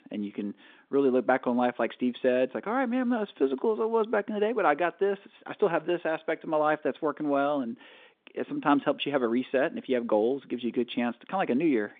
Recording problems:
phone-call audio

